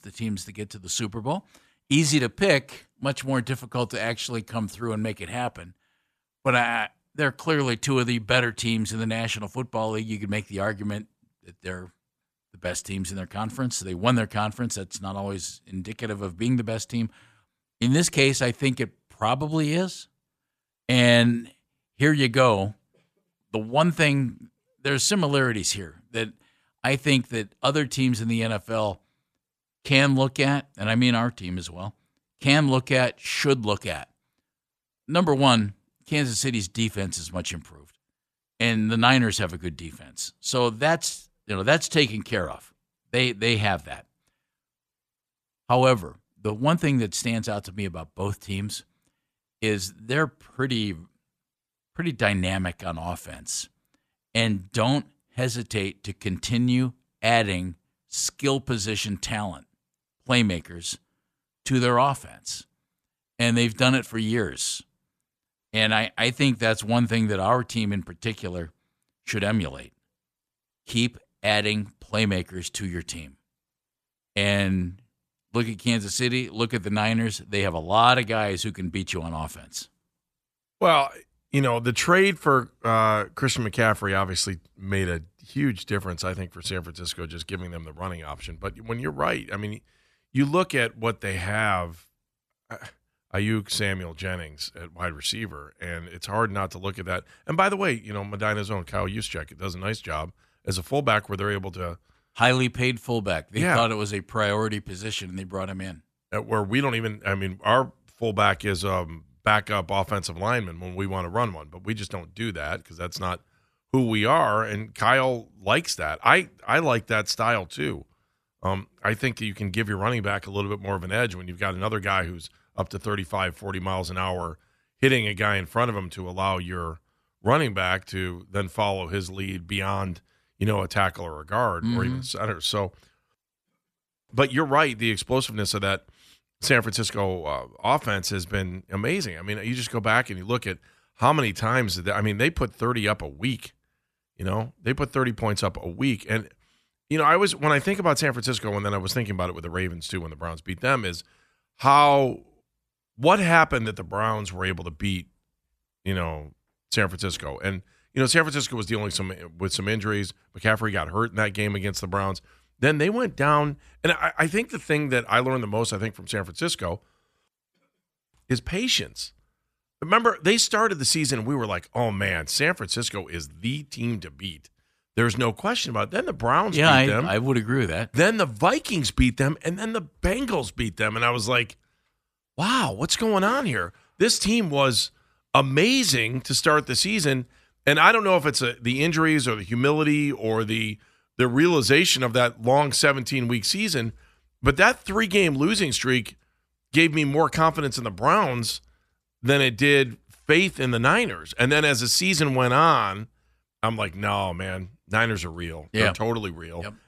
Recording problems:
none

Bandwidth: 14.5 kHz